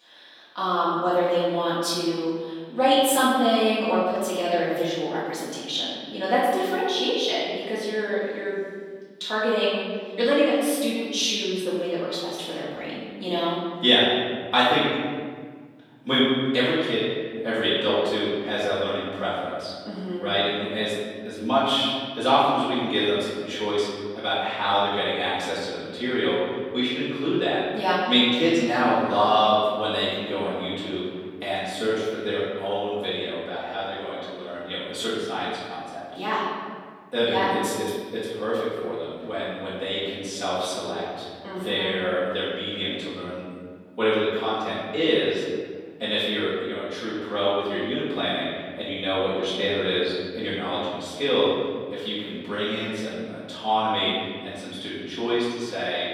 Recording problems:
room echo; strong; dies away in 1.8 s
off-mic speech; far
thin; somewhat; fading below 400 Hz

